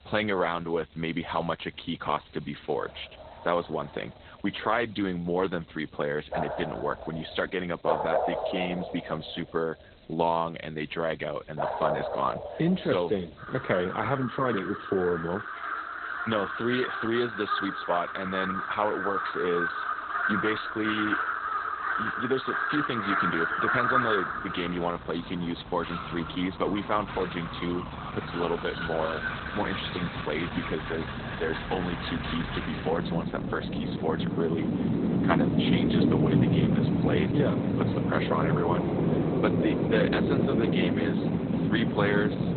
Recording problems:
garbled, watery; badly; nothing above 4 kHz
animal sounds; very loud; throughout; 1 dB above the speech
hiss; faint; throughout; 30 dB below the speech

